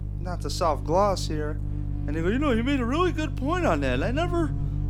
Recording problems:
electrical hum; noticeable; throughout; 50 Hz, 15 dB below the speech

